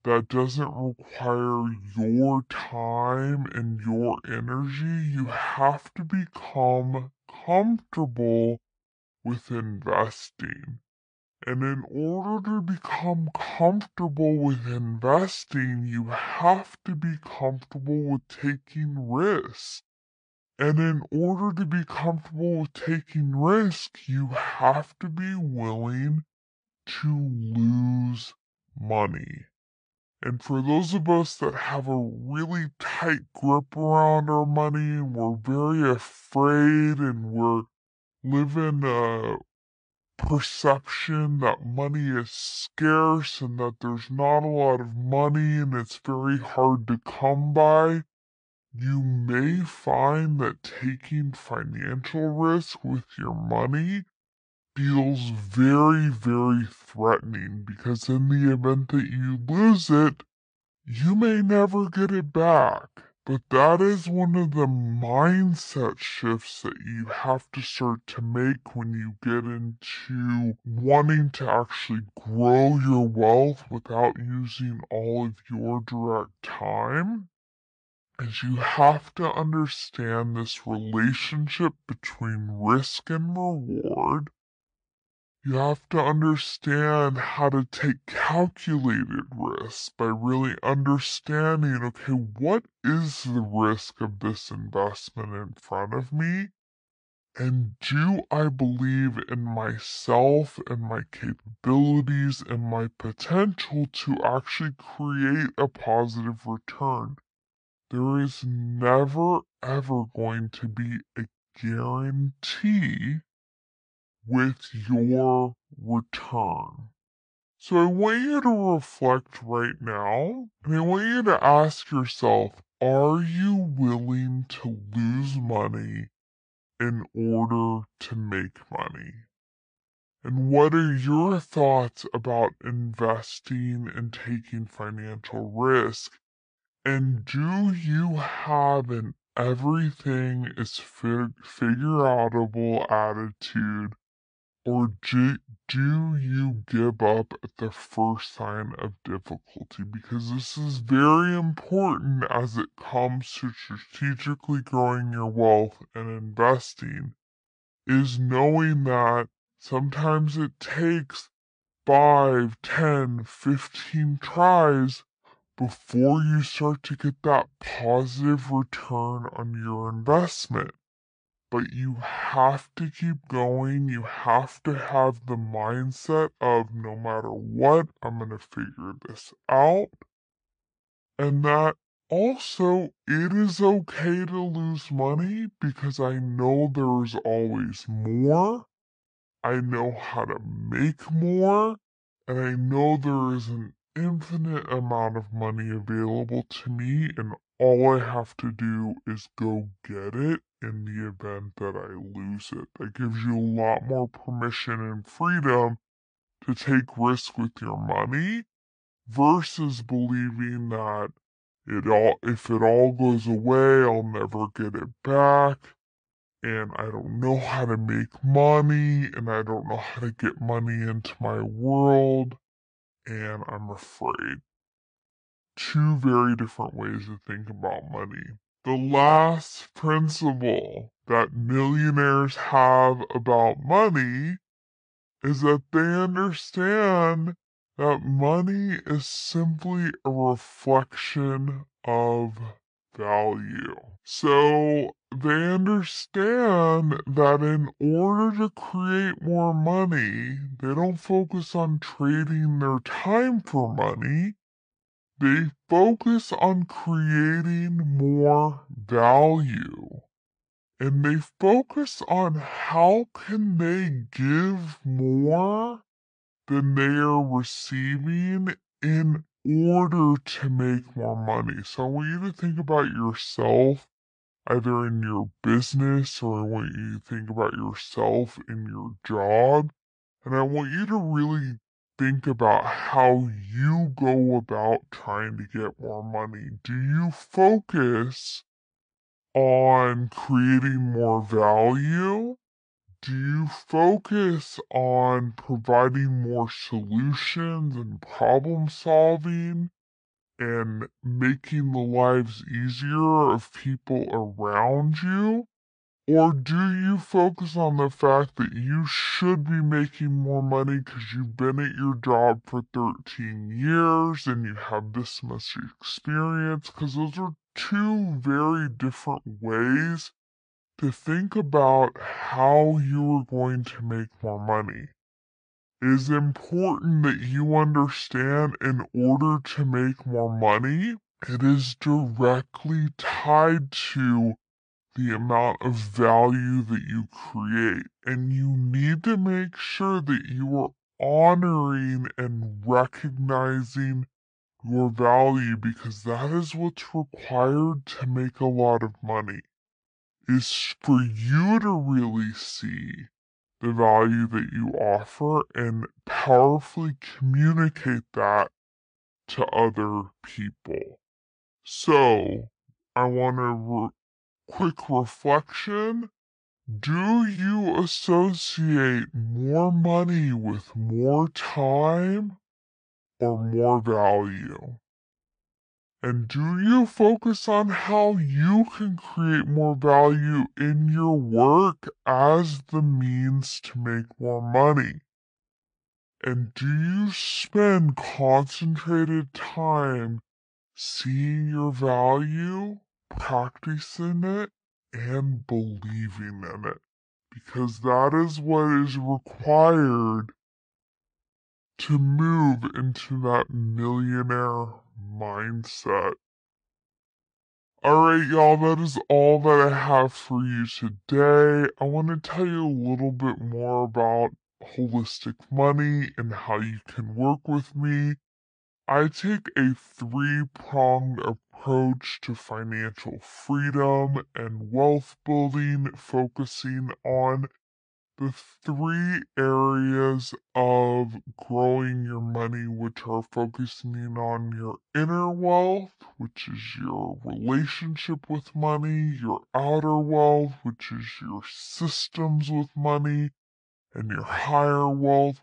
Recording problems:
wrong speed and pitch; too slow and too low; 0.6 times normal speed

